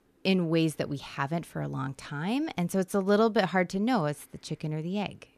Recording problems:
none

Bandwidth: 14.5 kHz